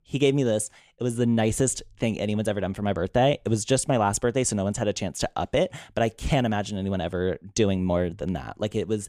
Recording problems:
none

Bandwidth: 15 kHz